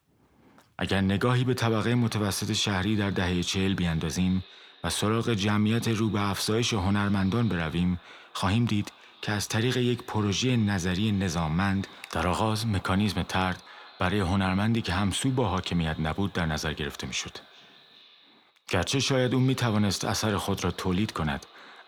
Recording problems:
echo of what is said; faint; throughout; 380 ms later, 25 dB below the speech

